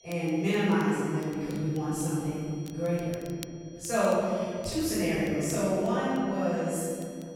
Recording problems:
room echo; strong; dies away in 2.5 s
off-mic speech; far
high-pitched whine; faint; throughout; 5.5 kHz, 25 dB below the speech
crackle, like an old record; very faint; 25 dB below the speech

